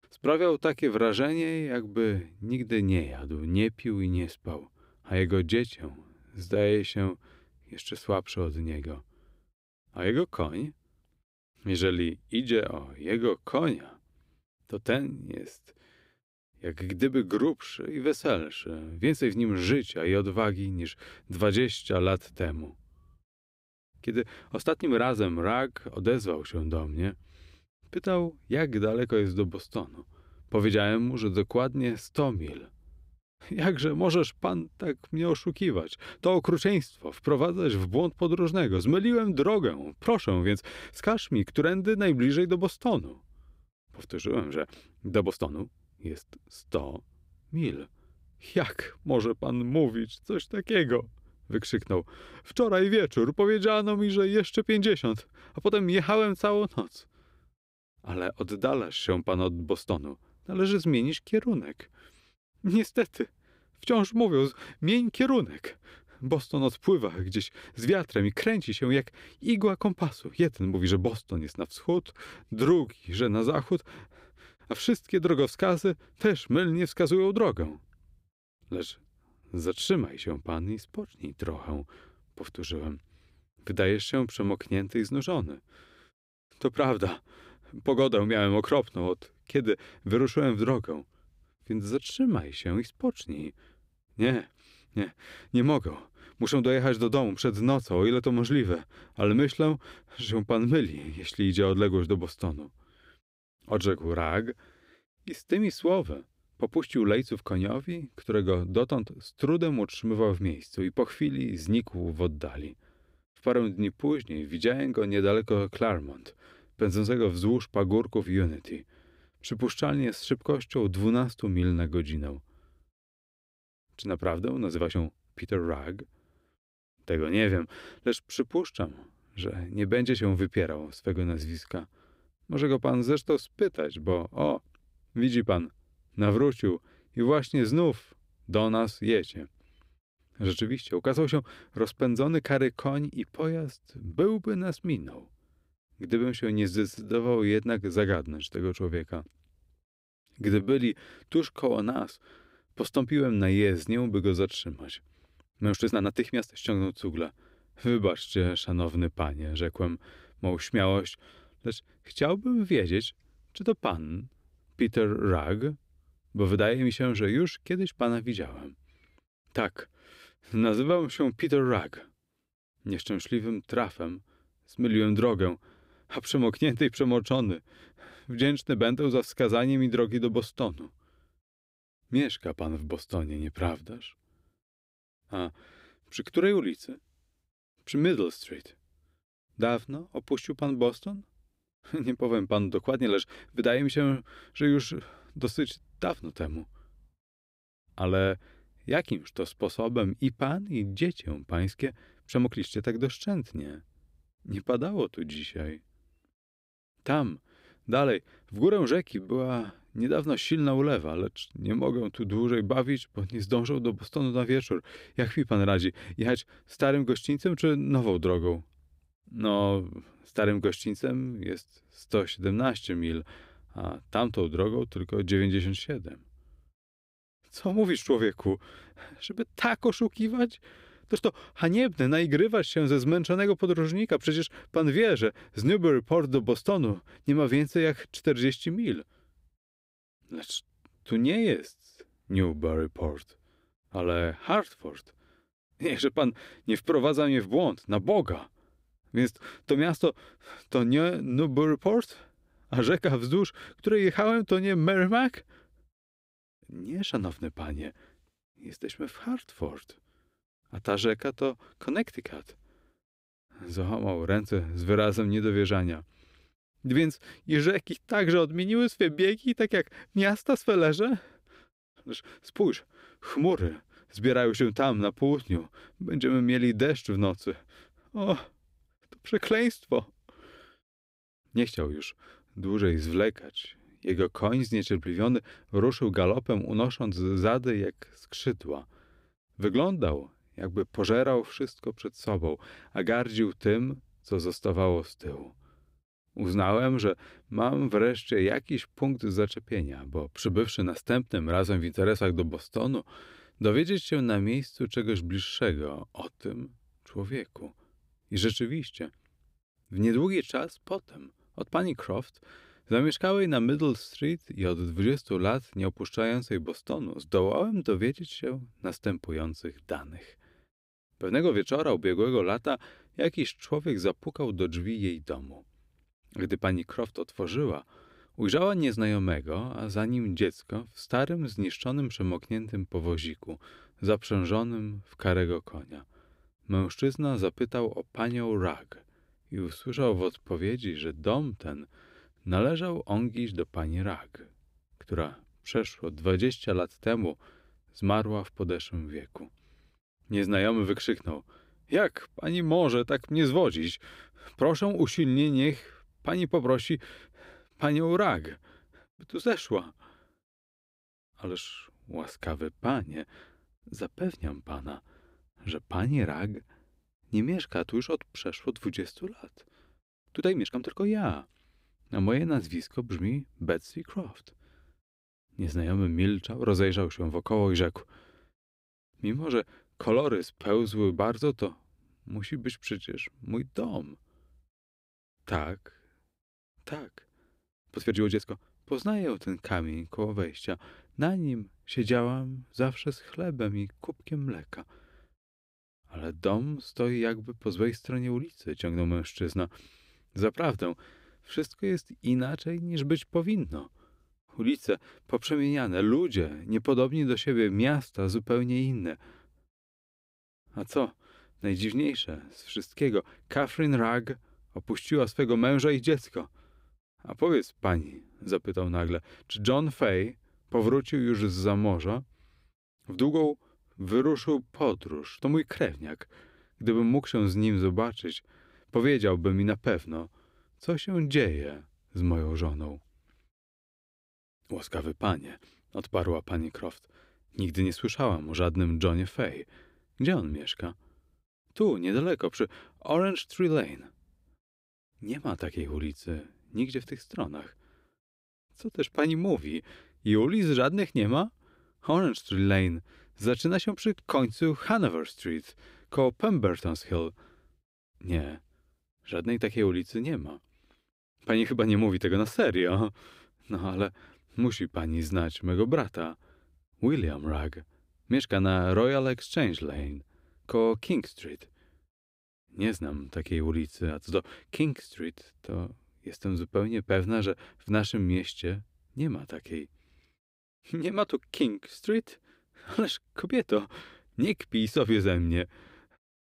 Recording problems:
uneven, jittery; strongly; from 6.5 s to 7:30

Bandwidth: 15.5 kHz